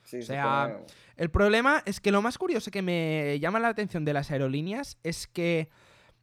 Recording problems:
none

